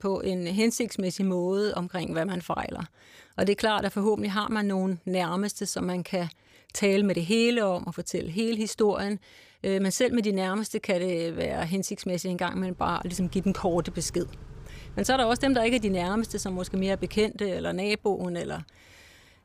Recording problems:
traffic noise; noticeable; from 13 s on; 20 dB below the speech

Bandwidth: 15 kHz